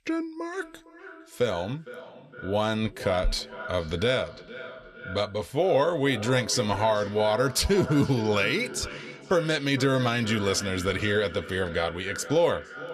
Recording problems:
echo of what is said; noticeable; throughout; 460 ms later, 15 dB below the speech

